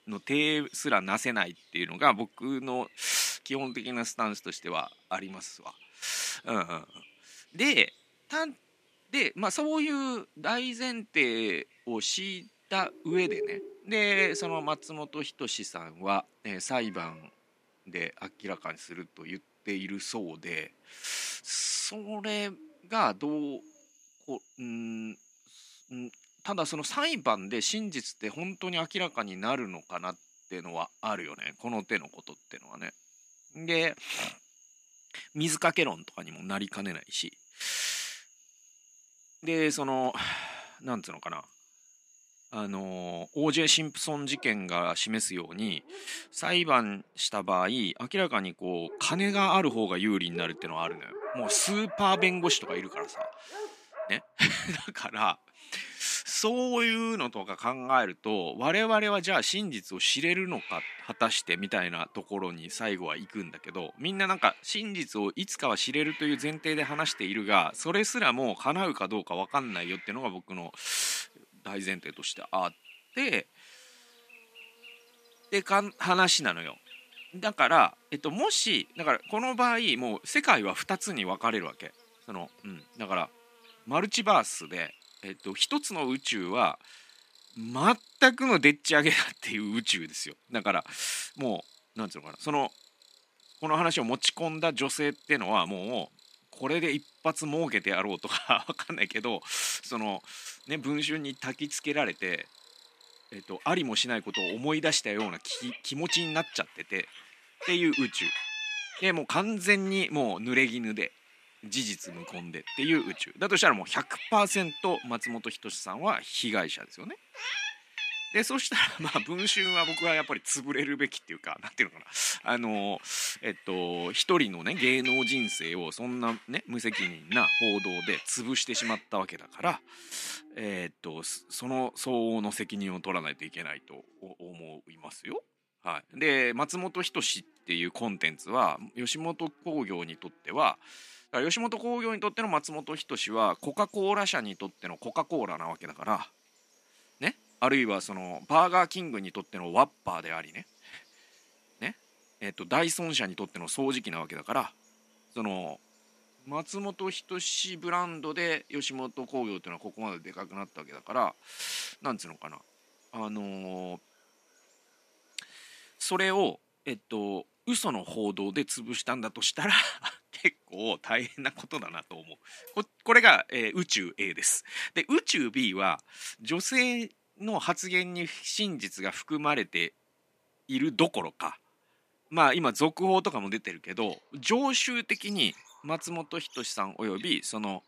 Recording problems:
thin; somewhat; fading below 250 Hz
animal sounds; loud; throughout; 8 dB below the speech

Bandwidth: 14.5 kHz